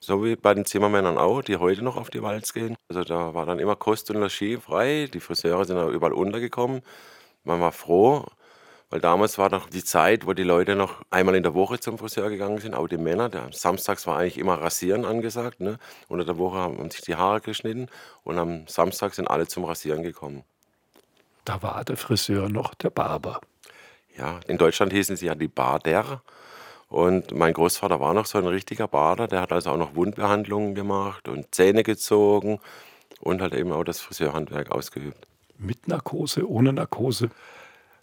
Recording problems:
none

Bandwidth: 17.5 kHz